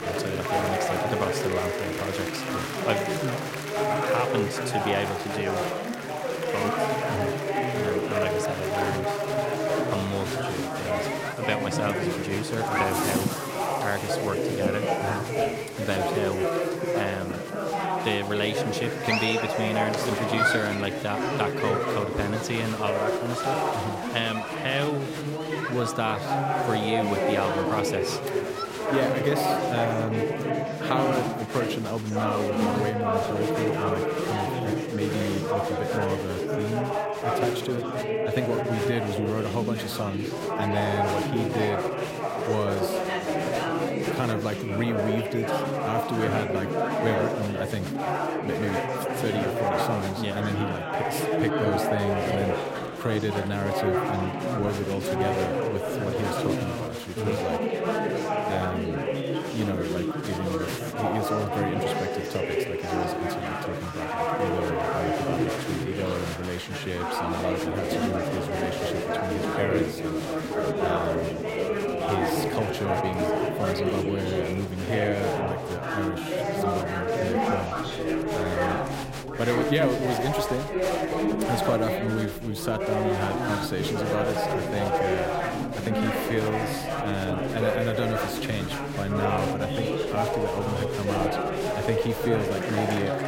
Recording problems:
chatter from many people; very loud; throughout; 3 dB above the speech

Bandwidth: 16 kHz